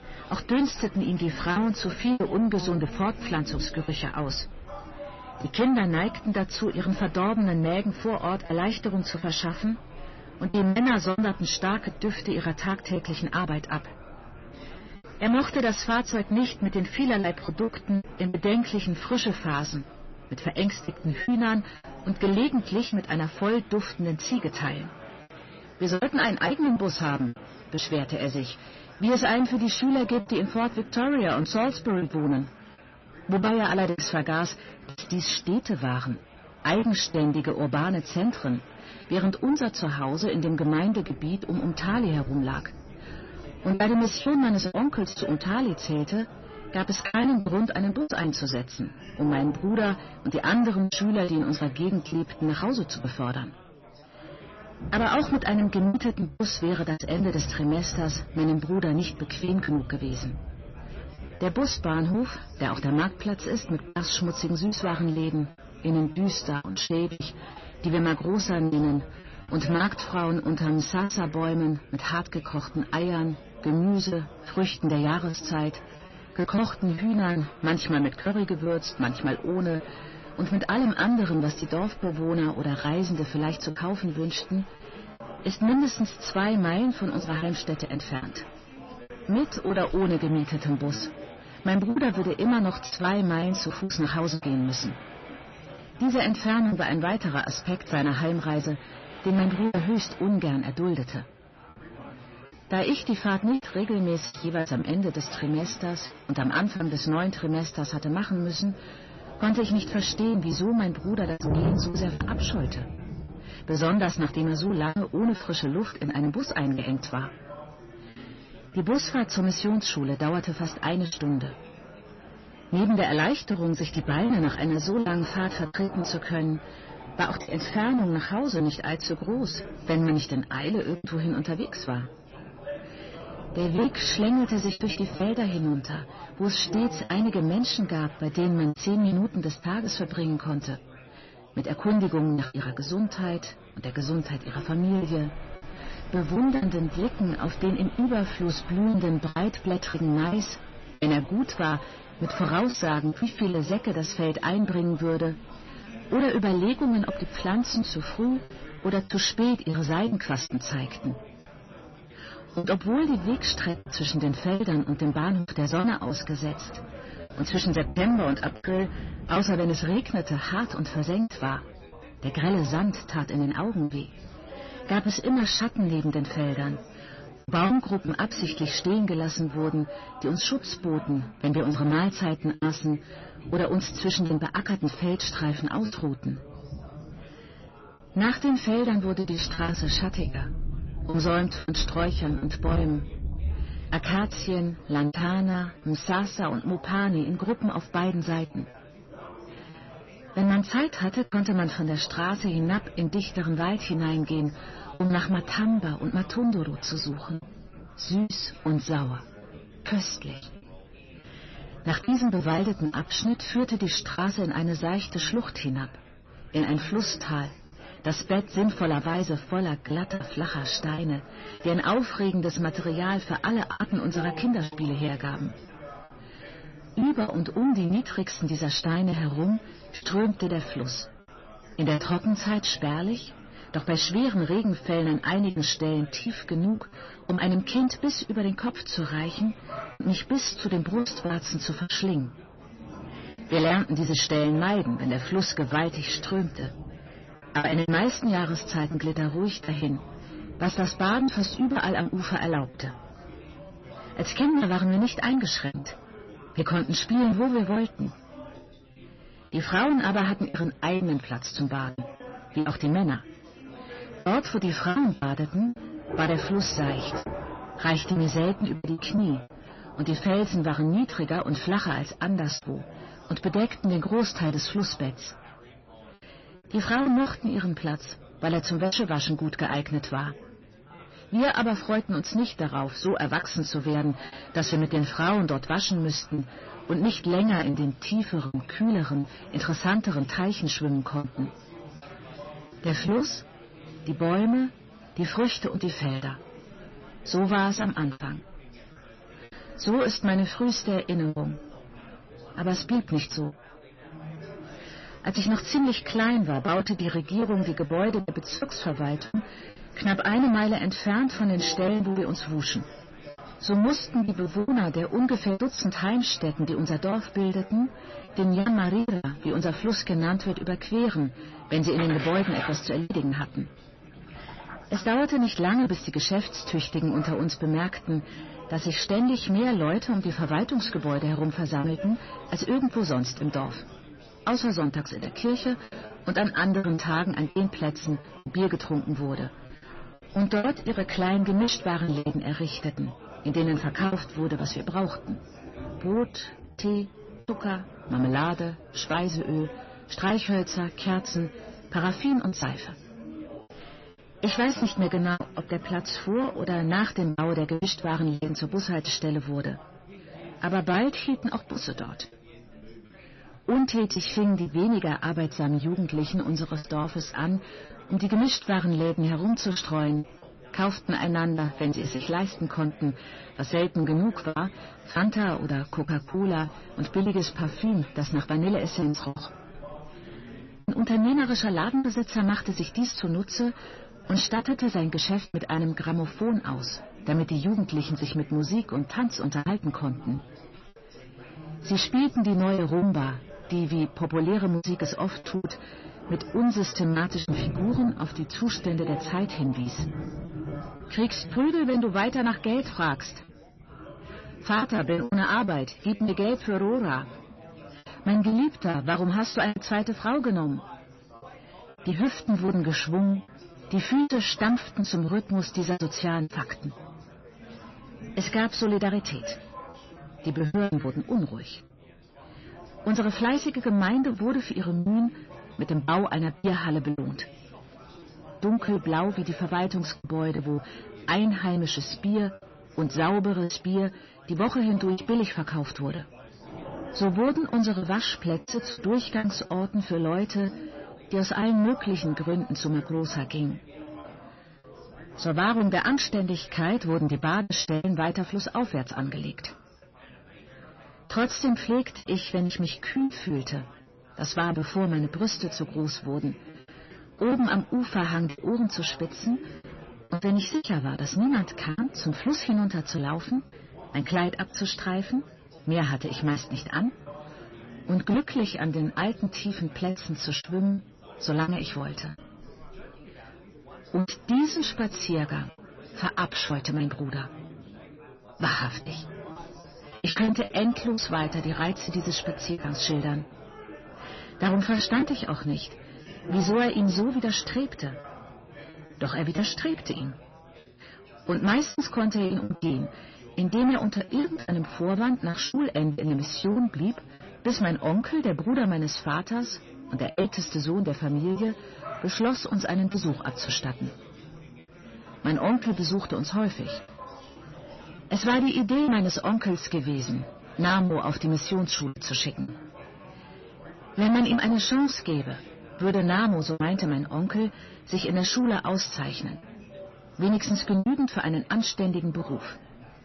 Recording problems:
distortion; slight; 10 dB below the speech
garbled, watery; slightly; nothing above 6 kHz
rain or running water; noticeable; throughout; 15 dB below the speech
chatter from many people; noticeable; throughout; 20 dB below the speech
choppy; very; 6% of the speech affected

